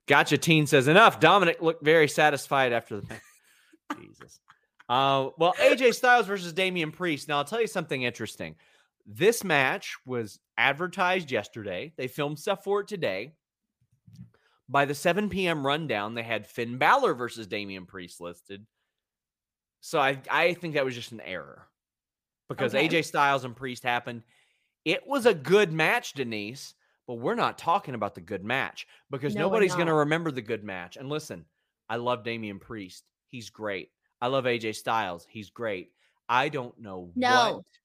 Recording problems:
none

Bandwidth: 15 kHz